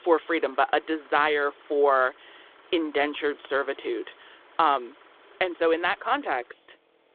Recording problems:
phone-call audio
traffic noise; faint; throughout; 25 dB below the speech

